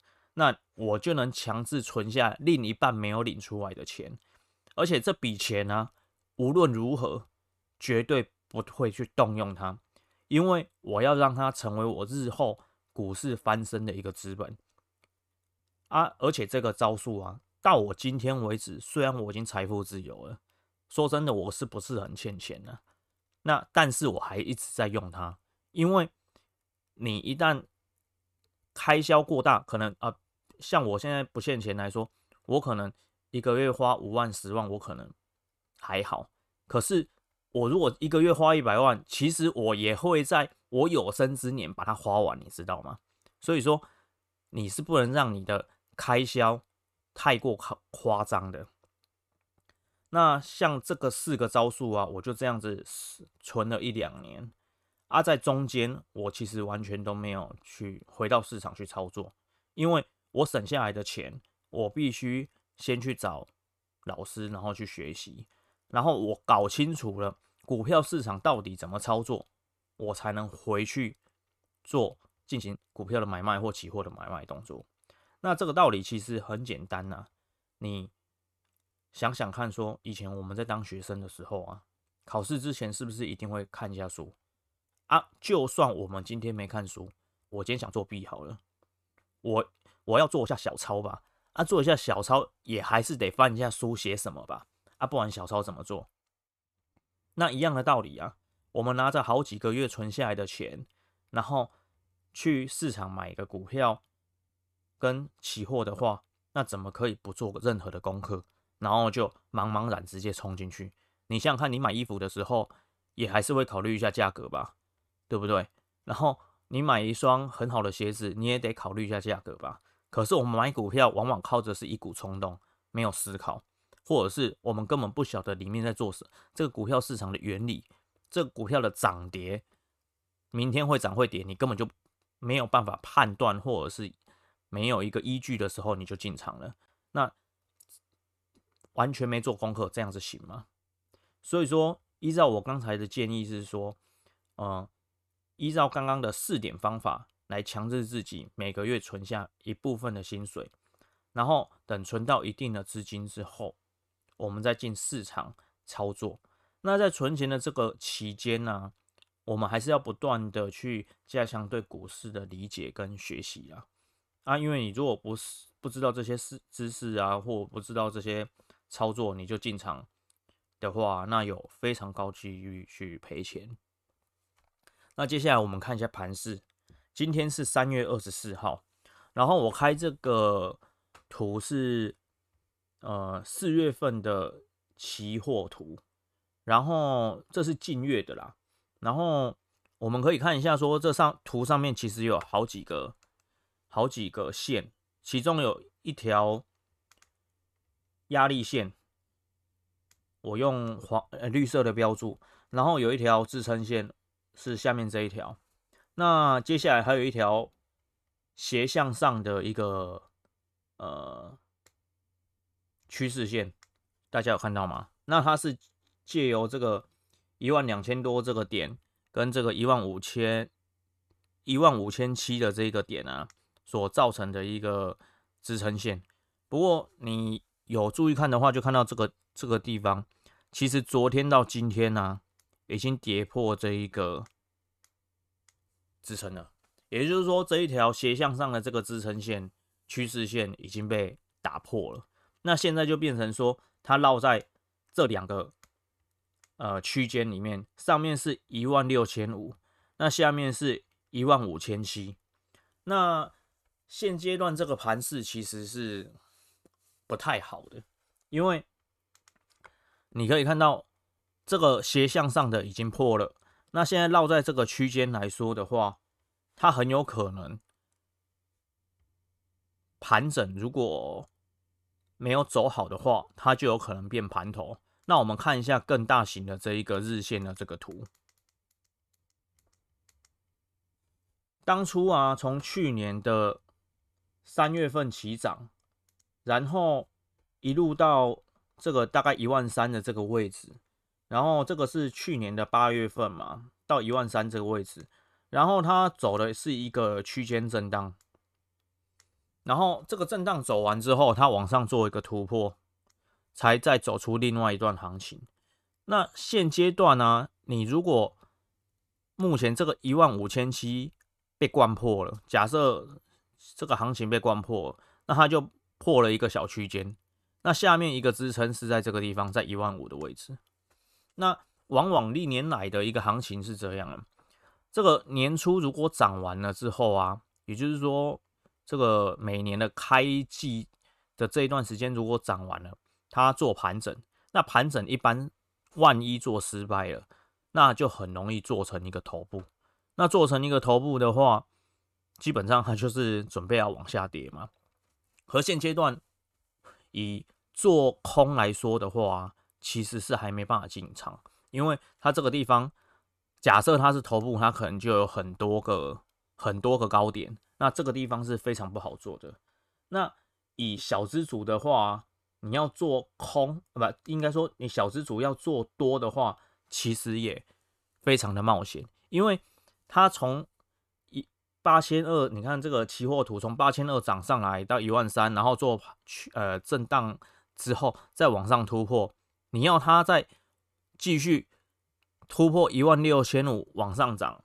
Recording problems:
uneven, jittery; strongly; from 29 s to 5:23

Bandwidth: 13.5 kHz